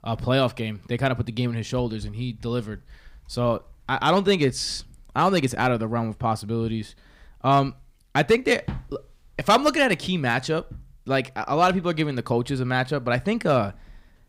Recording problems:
none

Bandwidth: 15.5 kHz